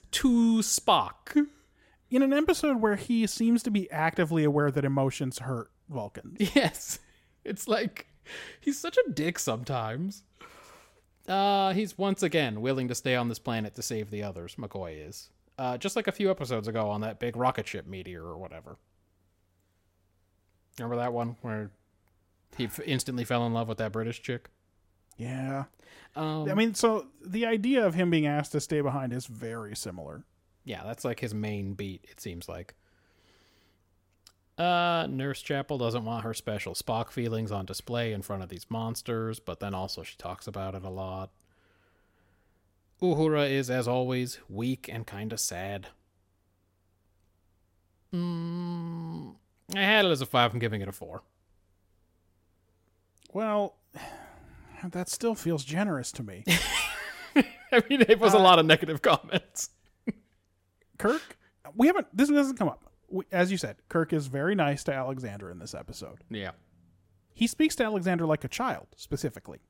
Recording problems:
none

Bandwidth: 16 kHz